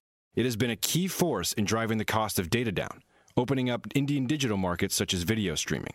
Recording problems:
squashed, flat; heavily

